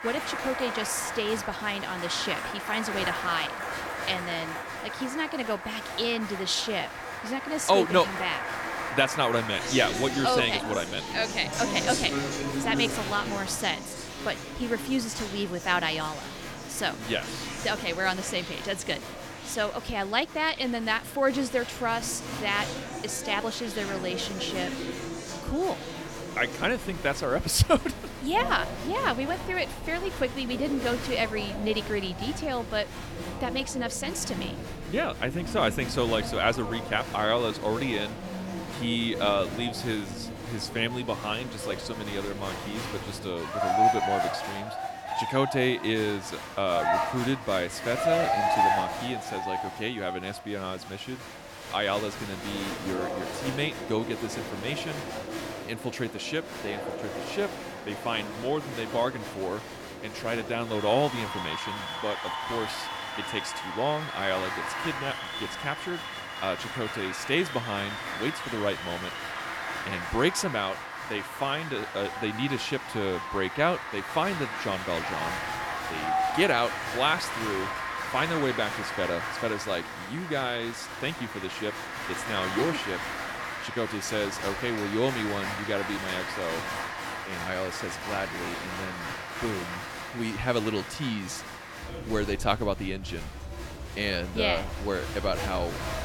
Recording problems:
crowd noise; loud; throughout; 4 dB below the speech

